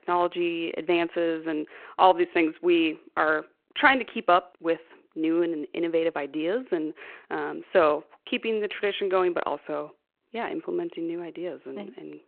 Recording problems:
phone-call audio

